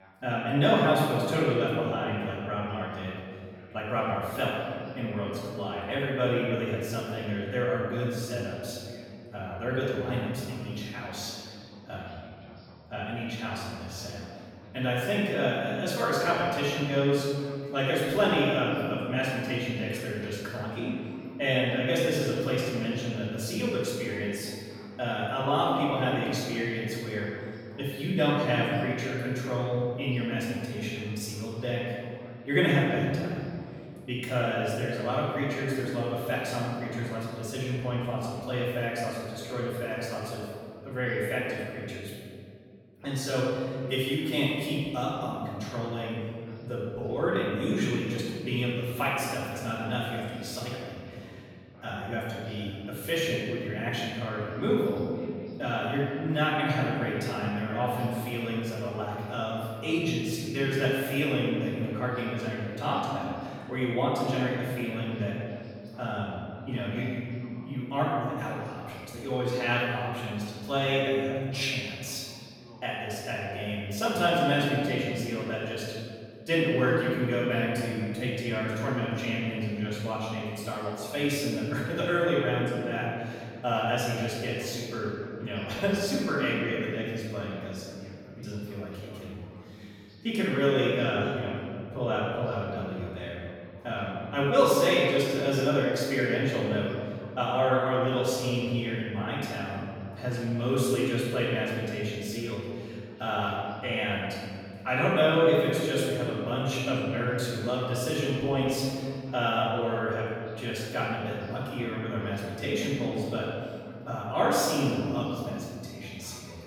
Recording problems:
room echo; strong; dies away in 2.2 s
off-mic speech; far
voice in the background; faint; throughout; 25 dB below the speech

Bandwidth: 17 kHz